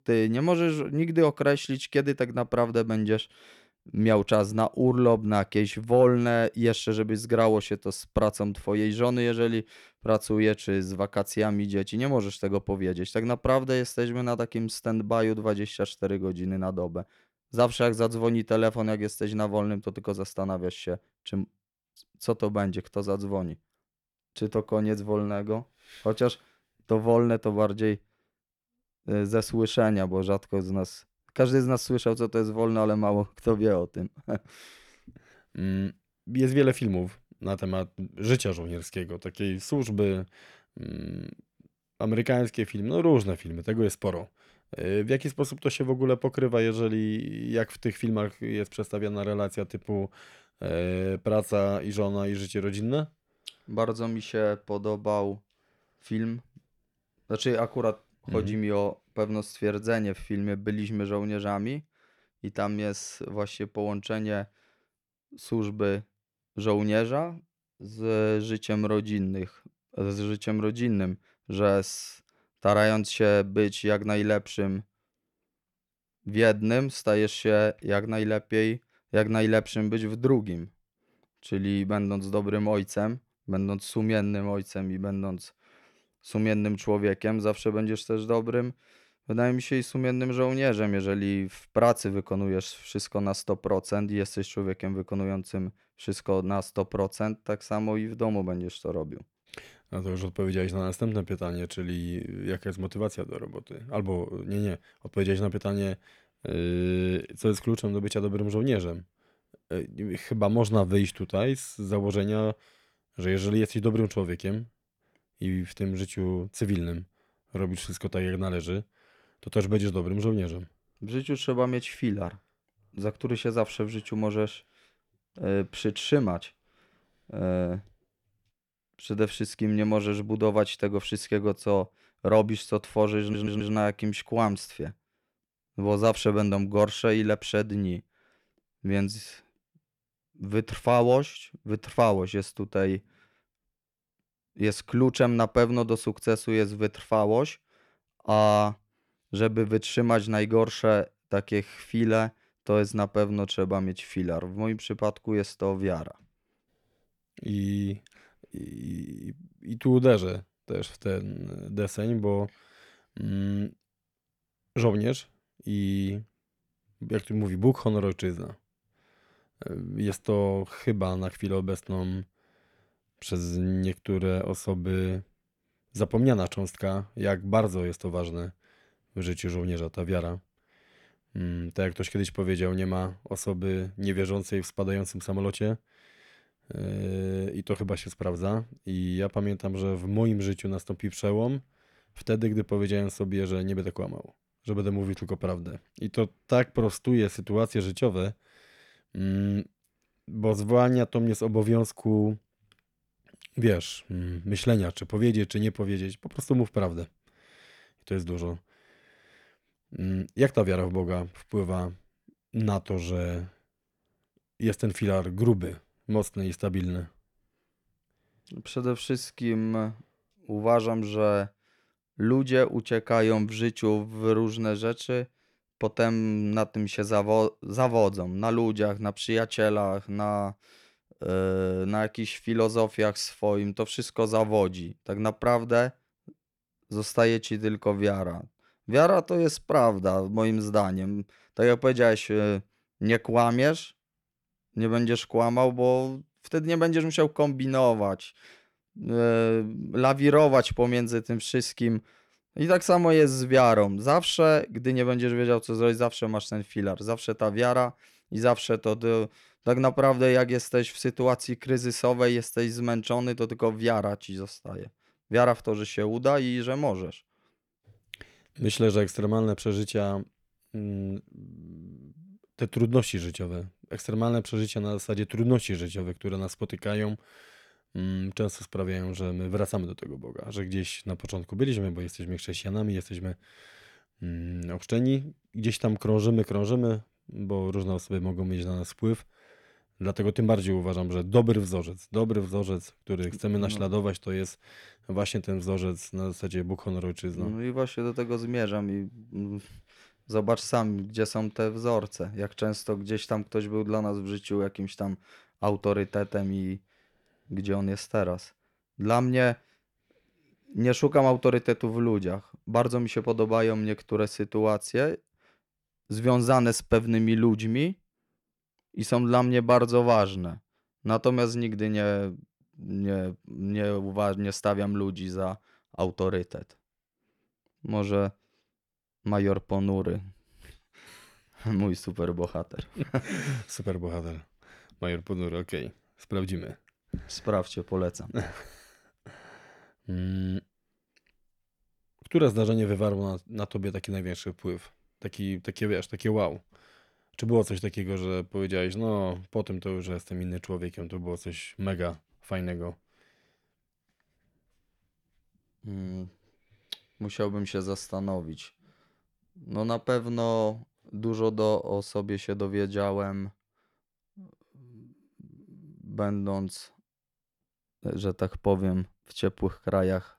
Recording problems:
audio stuttering; at 2:13

